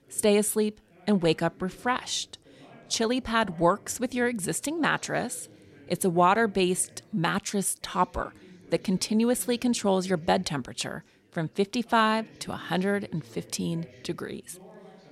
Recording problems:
background chatter; faint; throughout; 3 voices, 25 dB below the speech

